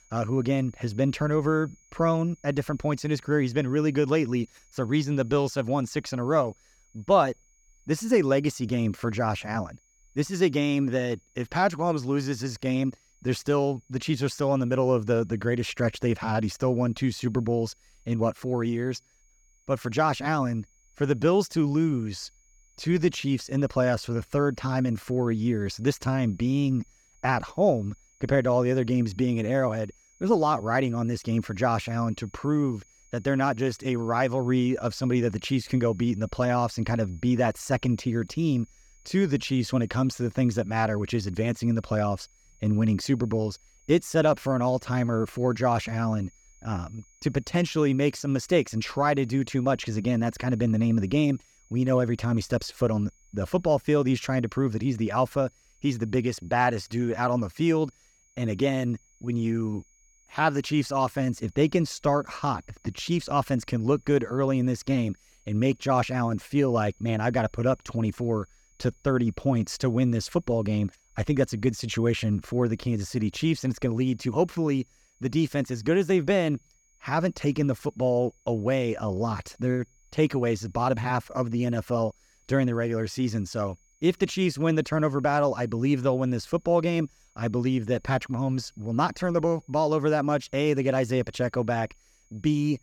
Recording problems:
high-pitched whine; faint; throughout; 6.5 kHz, 35 dB below the speech

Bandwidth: 18 kHz